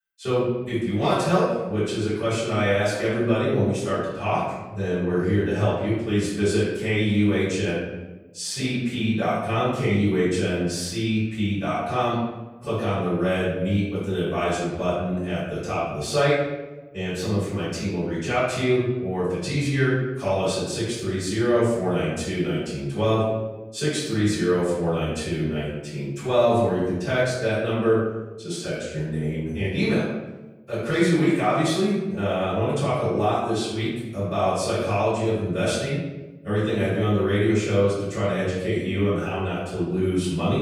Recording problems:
off-mic speech; far
room echo; noticeable; dies away in 0.9 s

